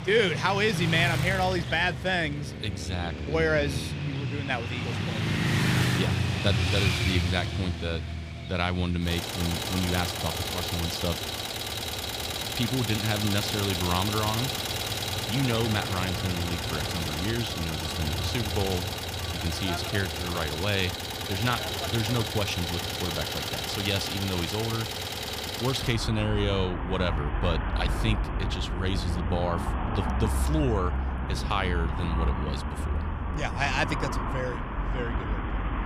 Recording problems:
traffic noise; loud; throughout; 1 dB below the speech

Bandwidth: 15 kHz